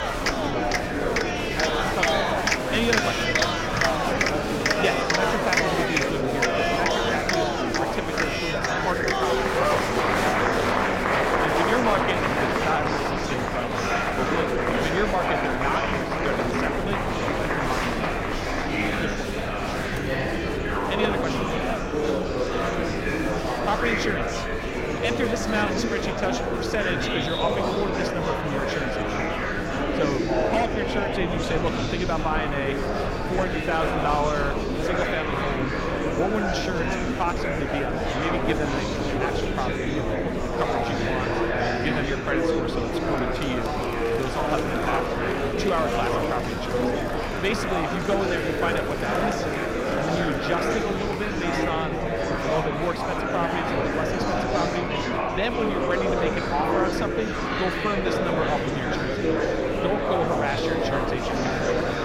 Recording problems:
murmuring crowd; very loud; throughout; 5 dB above the speech
low rumble; faint; throughout; 25 dB below the speech

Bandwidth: 16.5 kHz